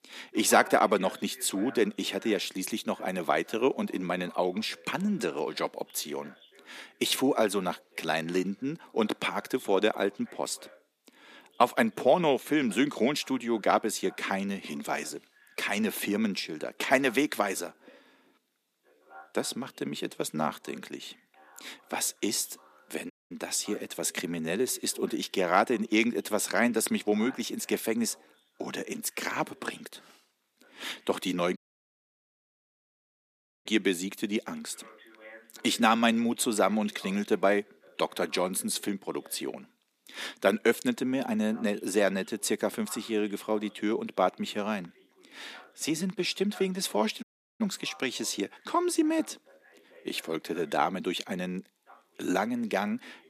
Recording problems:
thin; somewhat; fading below 250 Hz
voice in the background; faint; throughout; 25 dB below the speech
audio cutting out; at 23 s, at 32 s for 2 s and at 47 s

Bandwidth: 14.5 kHz